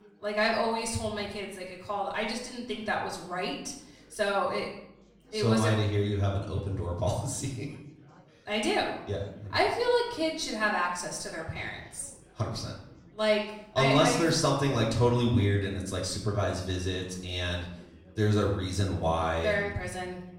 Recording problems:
off-mic speech; far
room echo; noticeable; dies away in 0.7 s
chatter from many people; faint; throughout; 30 dB below the speech

